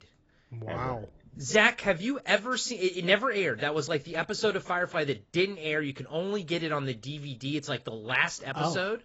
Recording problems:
garbled, watery; badly; nothing above 7.5 kHz

